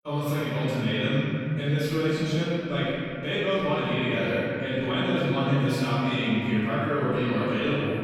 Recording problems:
room echo; strong; dies away in 2.5 s
off-mic speech; far
echo of what is said; noticeable; throughout; 120 ms later, 15 dB below the speech

